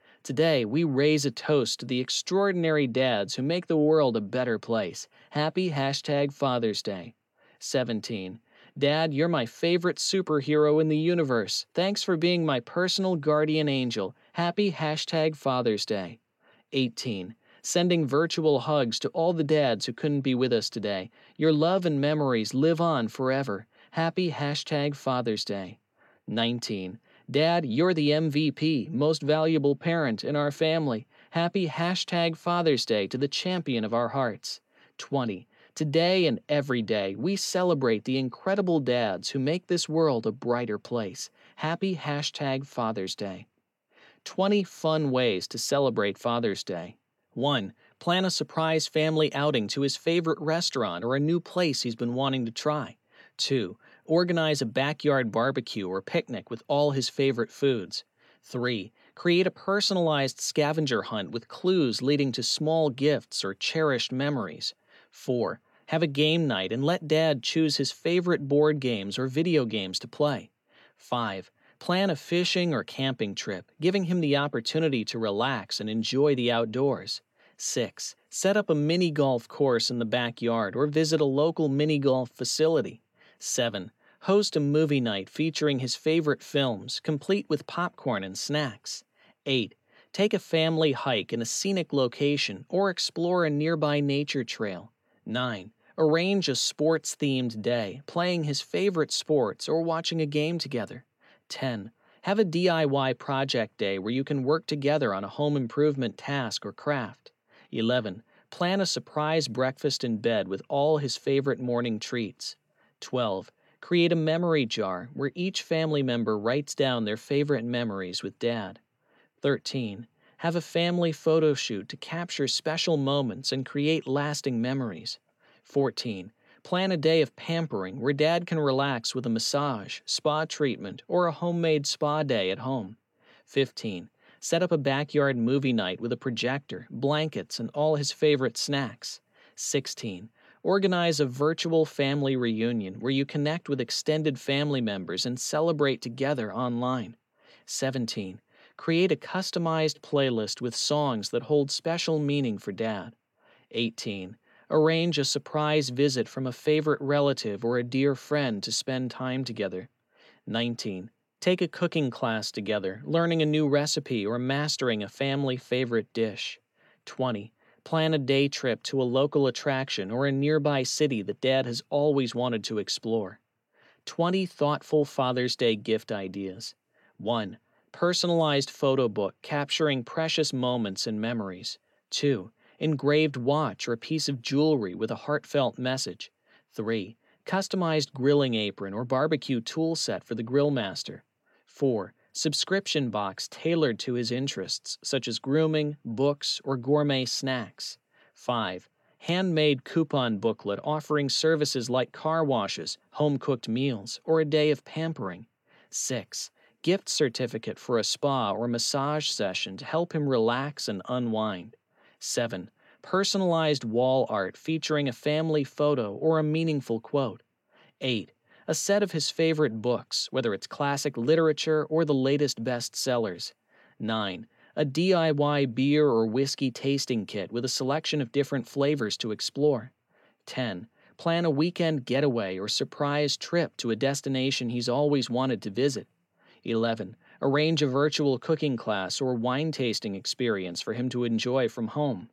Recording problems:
none

